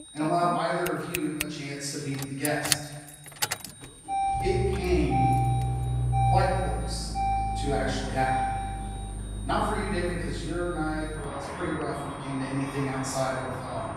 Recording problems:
room echo; strong; dies away in 1.2 s
off-mic speech; far
echo of what is said; faint; throughout; 460 ms later, 25 dB below the speech
traffic noise; loud; throughout; 1 dB below the speech
high-pitched whine; noticeable; throughout; 9 kHz, 20 dB below the speech

